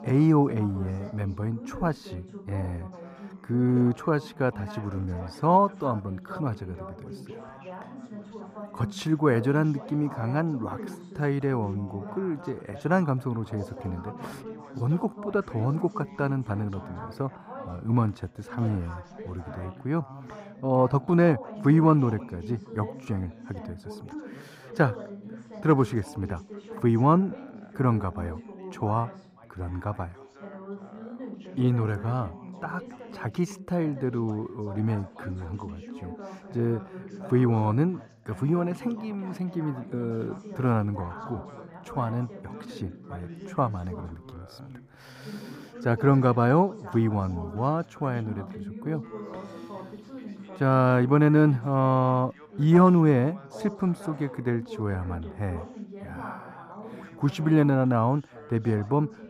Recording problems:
muffled; slightly; fading above 1.5 kHz
background chatter; noticeable; throughout; 3 voices, 15 dB below the speech

